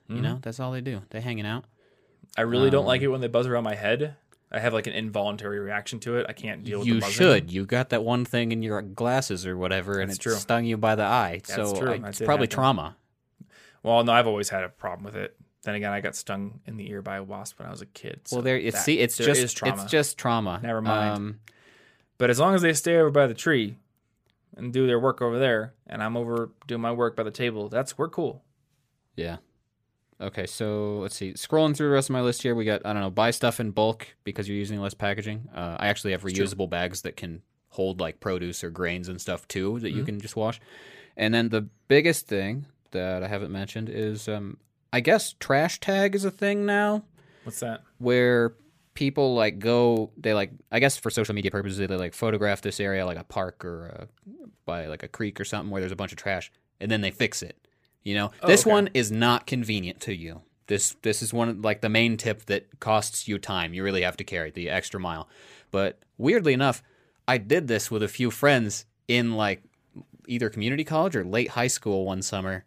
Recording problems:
uneven, jittery; strongly; from 7 s to 1:07

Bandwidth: 15 kHz